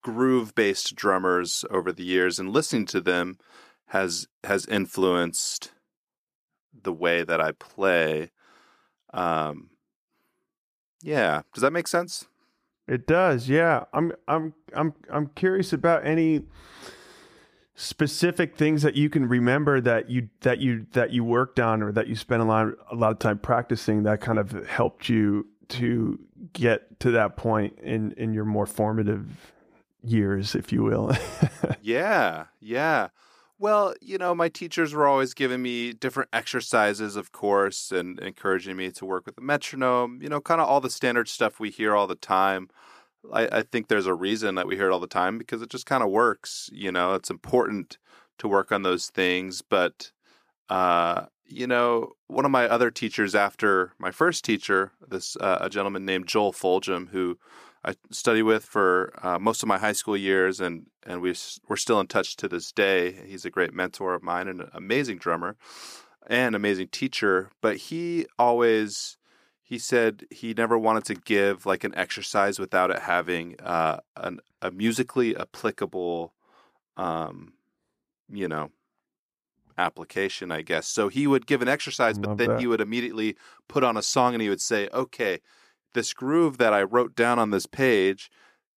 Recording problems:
none

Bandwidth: 14.5 kHz